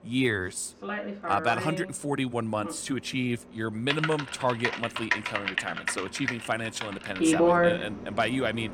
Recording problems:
household noises; very loud; throughout; 1 dB above the speech

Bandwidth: 17 kHz